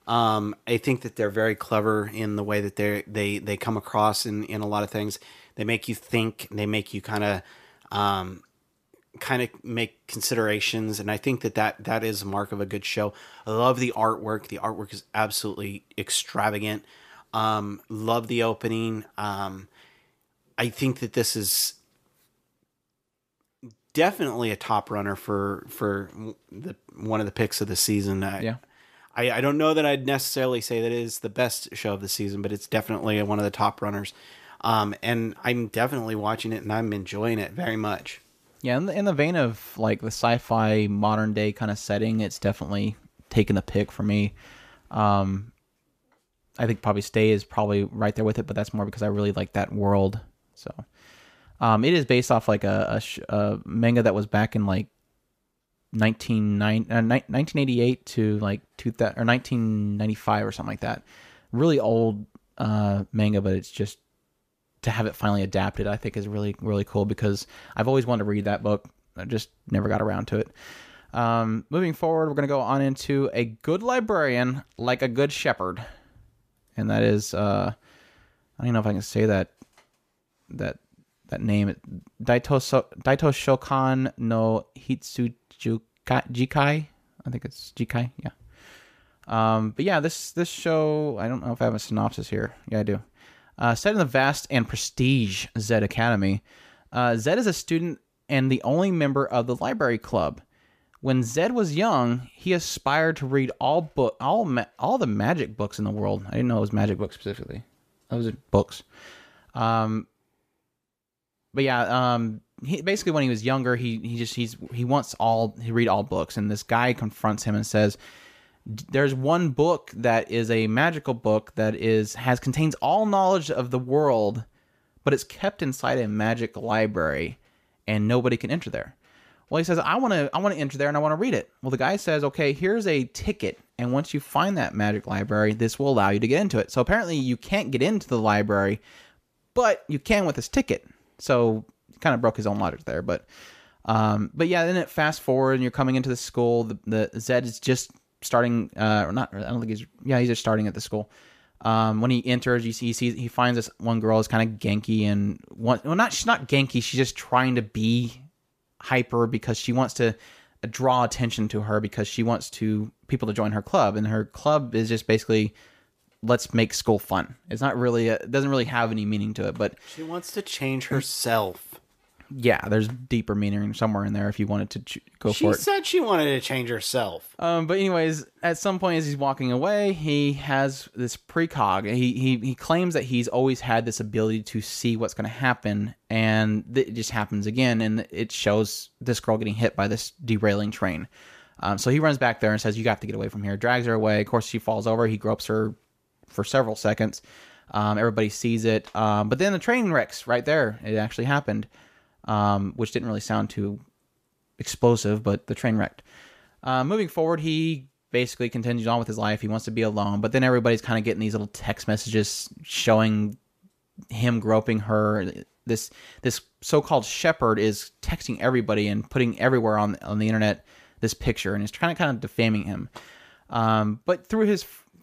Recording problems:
none

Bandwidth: 14.5 kHz